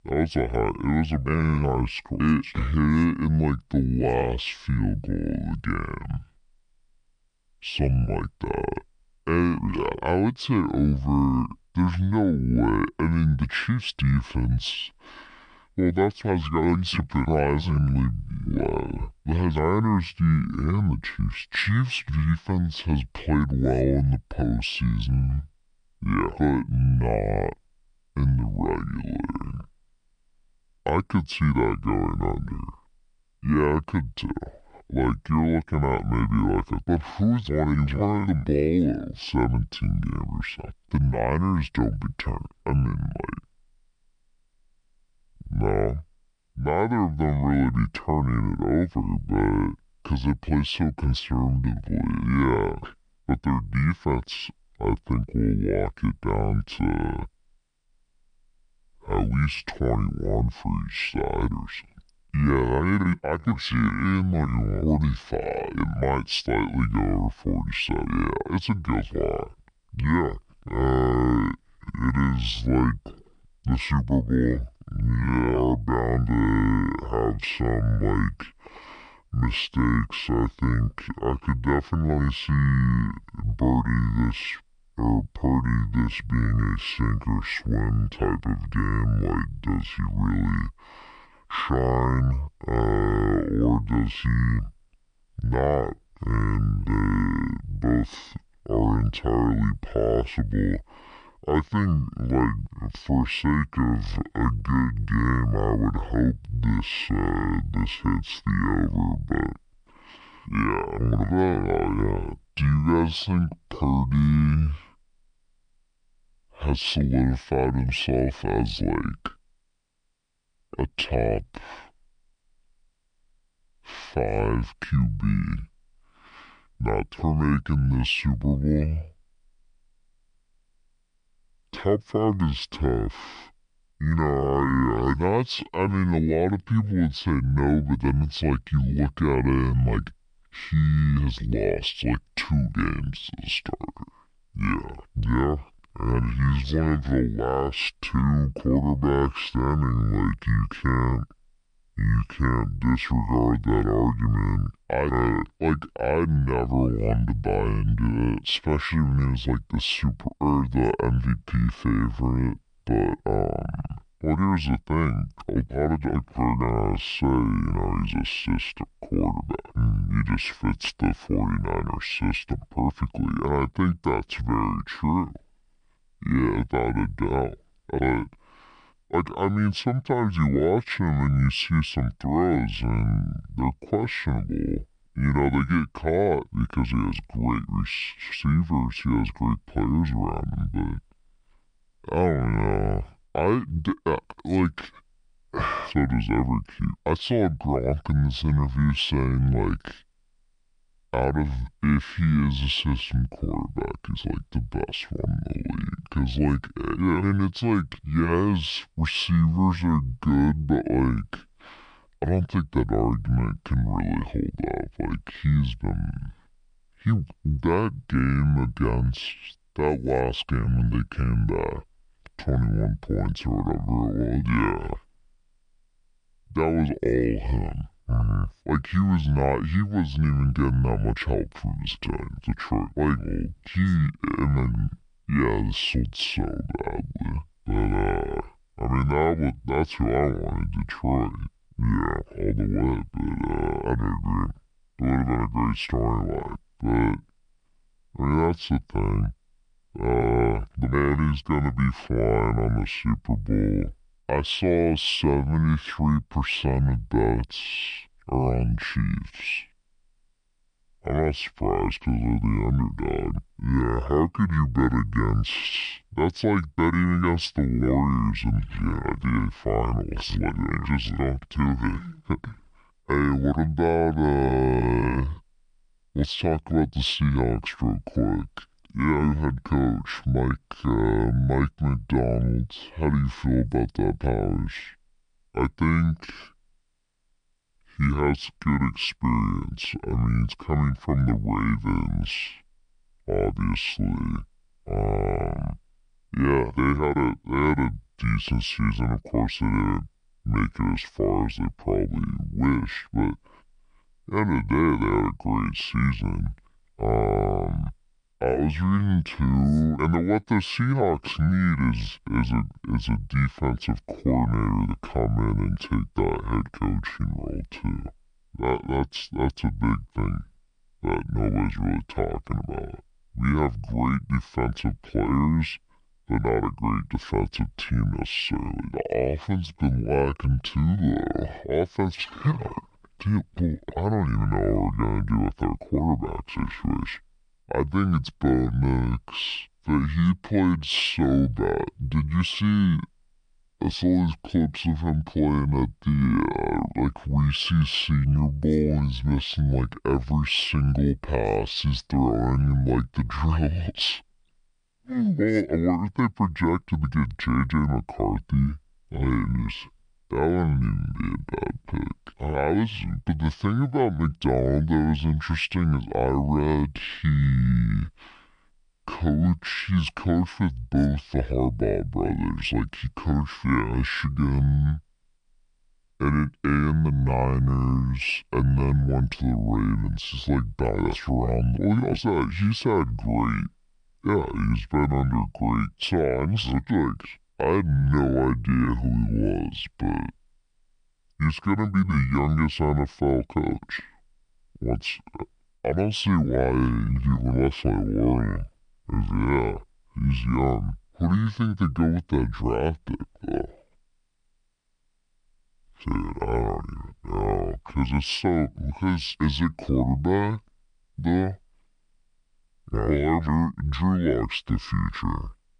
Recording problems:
wrong speed and pitch; too slow and too low; 0.6 times normal speed

